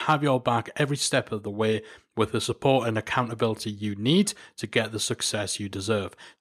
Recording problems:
abrupt cut into speech; at the start

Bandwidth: 14 kHz